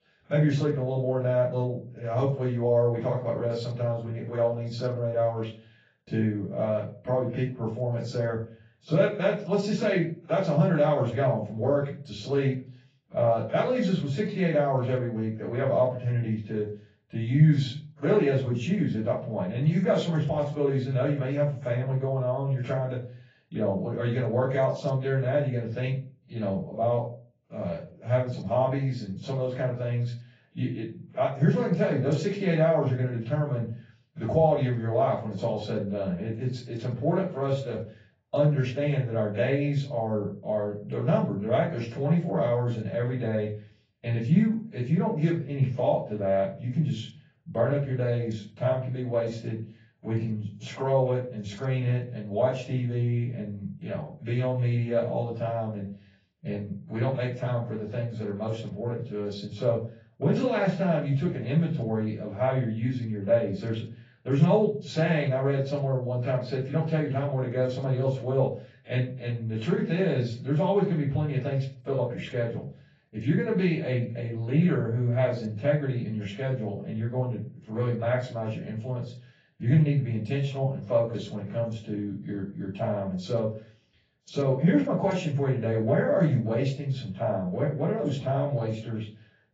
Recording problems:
off-mic speech; far
garbled, watery; badly; nothing above 7.5 kHz
room echo; slight; dies away in 0.3 s

